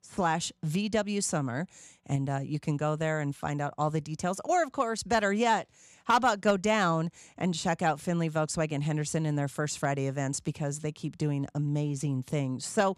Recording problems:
none

